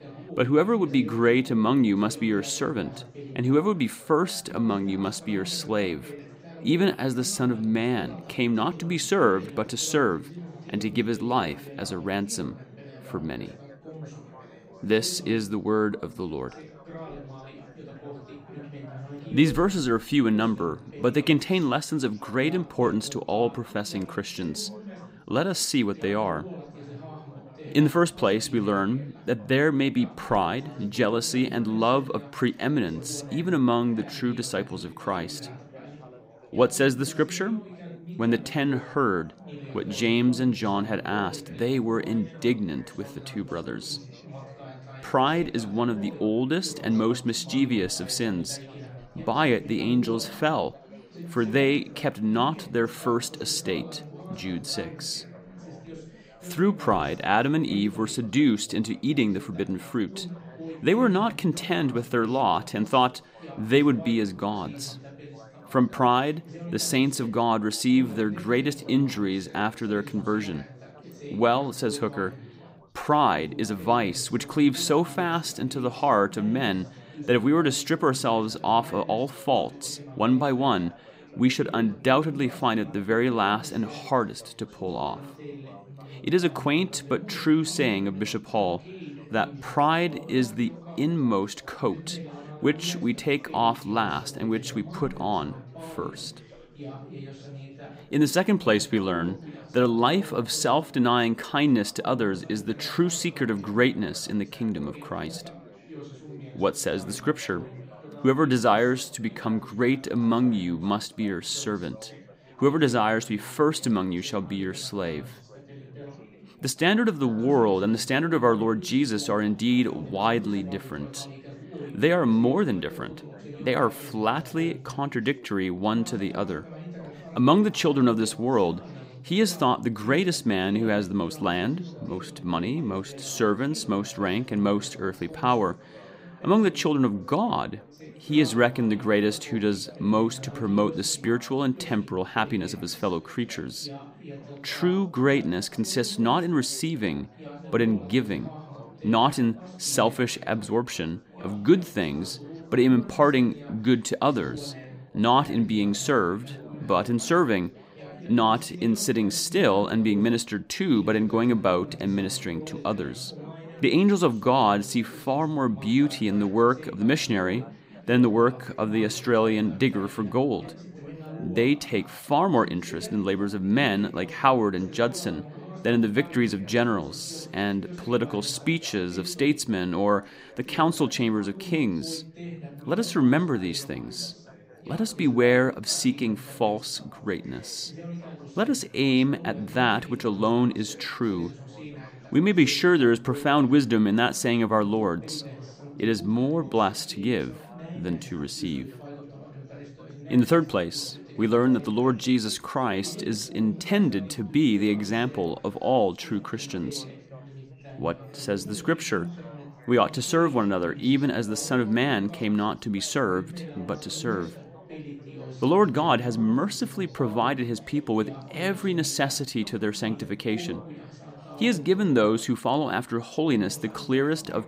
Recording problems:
background chatter; noticeable; throughout; 4 voices, 15 dB below the speech

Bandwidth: 15.5 kHz